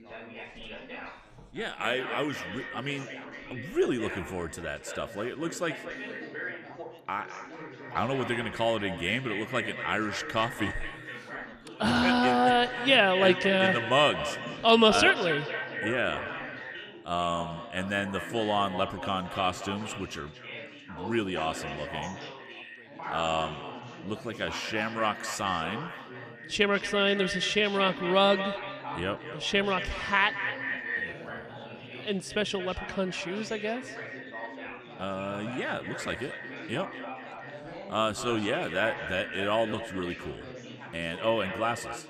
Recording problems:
echo of what is said; strong; throughout; 230 ms later, 9 dB below the speech
background chatter; noticeable; throughout; 4 voices, 15 dB below the speech

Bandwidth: 14.5 kHz